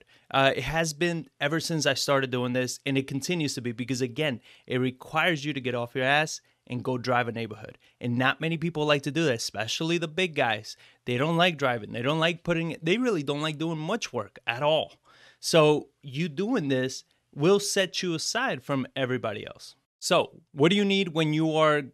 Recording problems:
none

